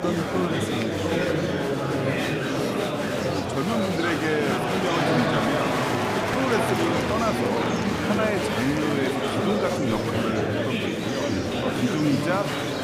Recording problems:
murmuring crowd; very loud; throughout; 3 dB above the speech

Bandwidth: 15.5 kHz